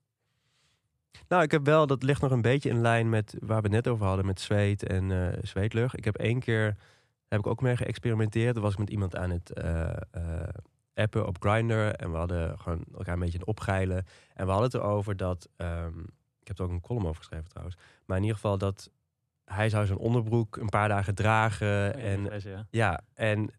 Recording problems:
none

